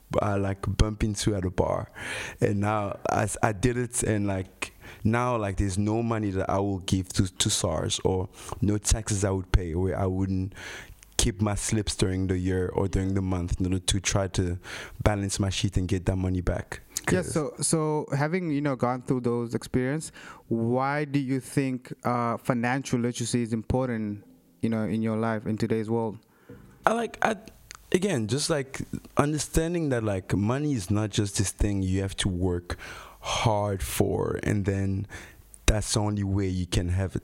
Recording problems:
squashed, flat; somewhat

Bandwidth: 16 kHz